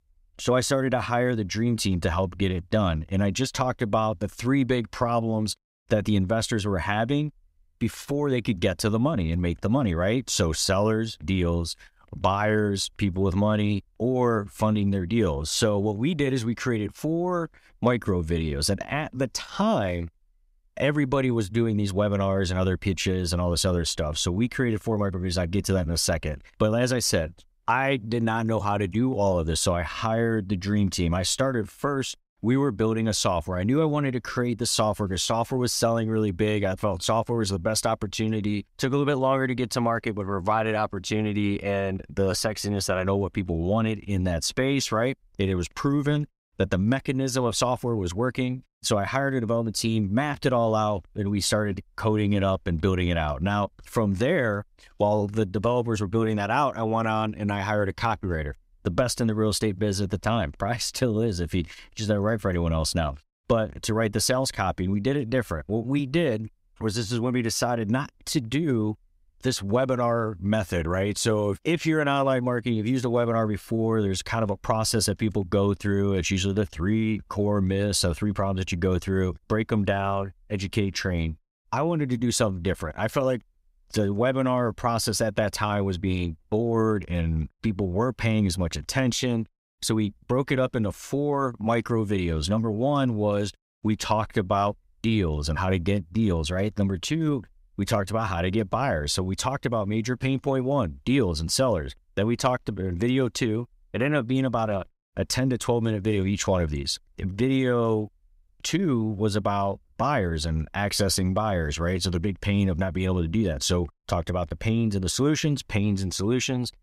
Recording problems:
none

